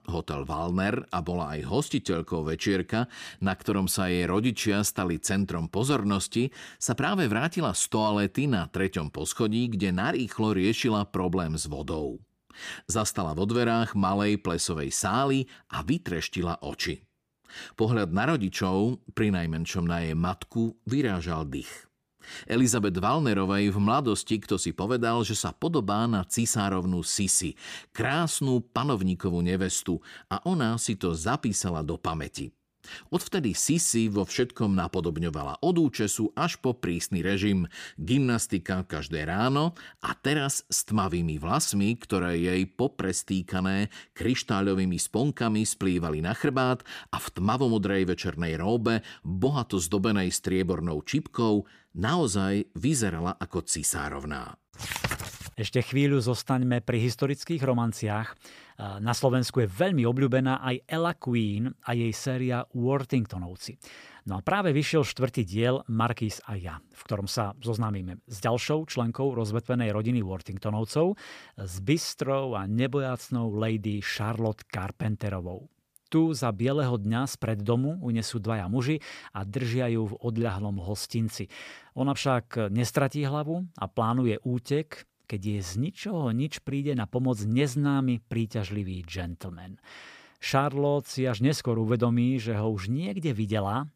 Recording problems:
none

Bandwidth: 15 kHz